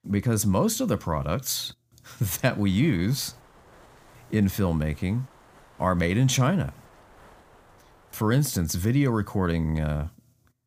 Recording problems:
wind noise on the microphone; occasional gusts; from 2 to 8.5 s; 25 dB below the speech

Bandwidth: 15 kHz